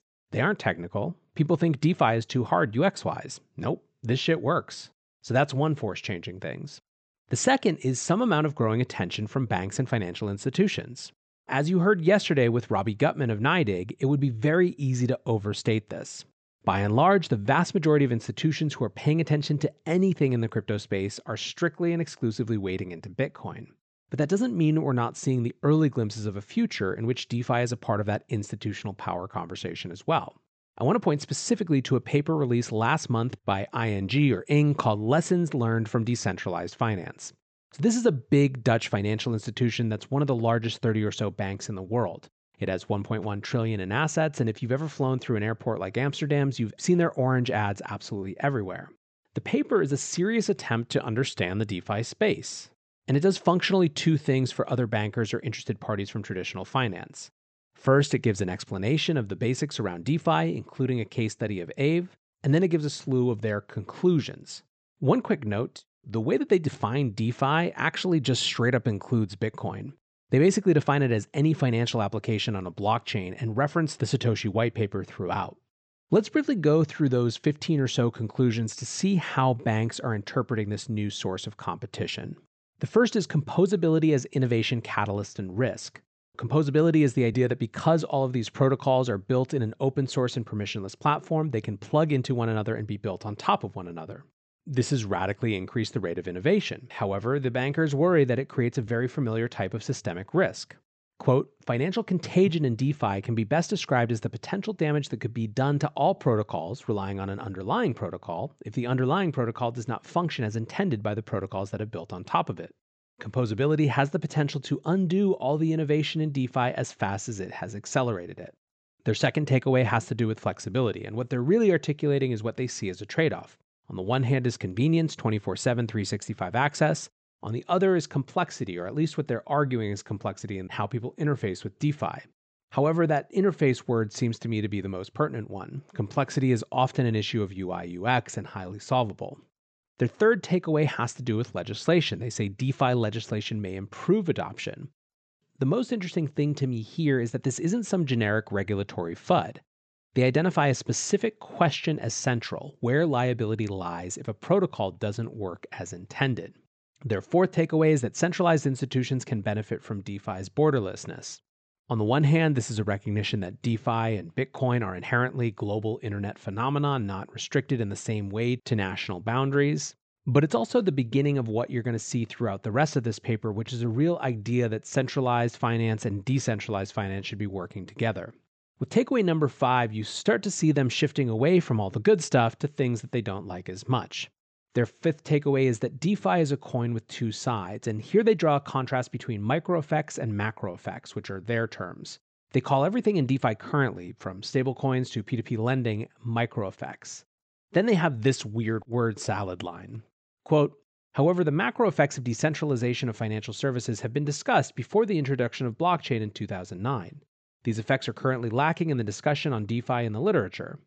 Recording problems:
high frequencies cut off; noticeable; nothing above 8 kHz

